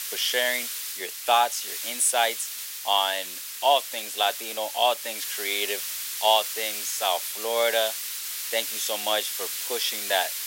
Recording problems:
thin; very; fading below 450 Hz
hiss; loud; throughout; 5 dB below the speech

